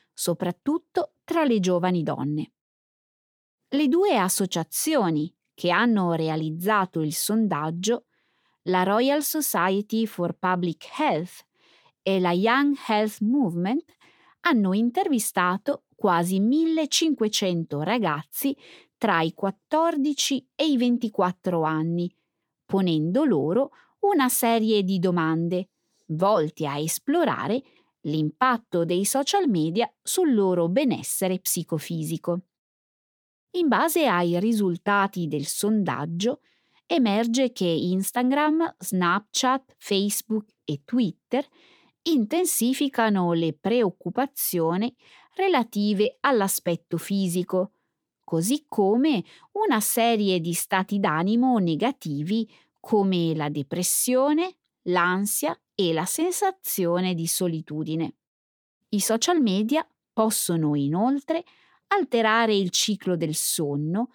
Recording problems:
none

